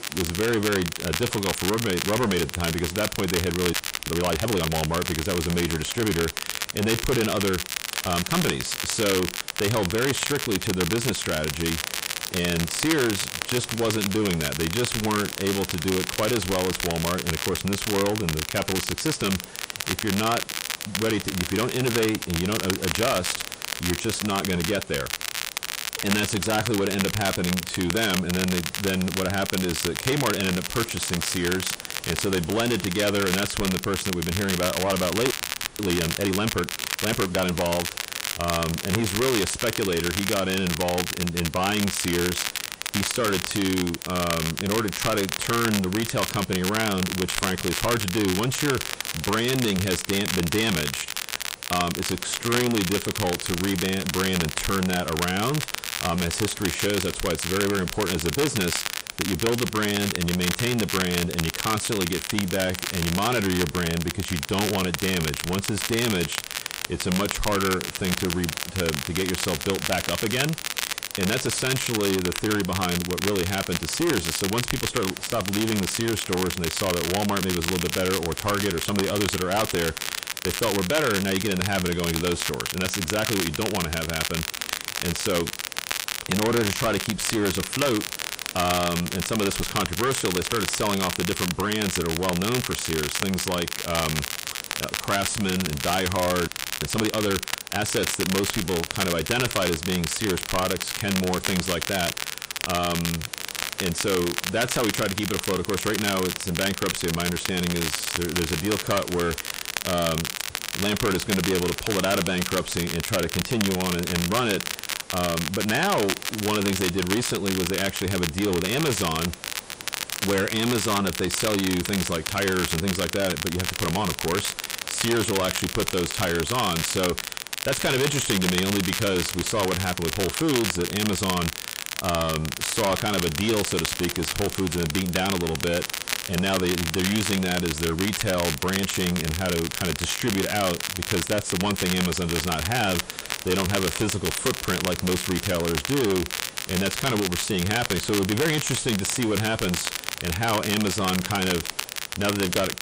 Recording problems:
distortion; heavy; 7 dB below the speech
garbled, watery; slightly; nothing above 9 kHz
crackle, like an old record; loud; 3 dB below the speech
hiss; noticeable; throughout; 20 dB below the speech
audio freezing; at 3.5 s, at 35 s and at 1:36

